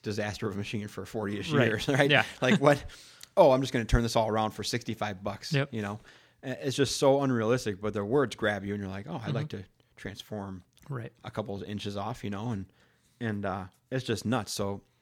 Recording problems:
none

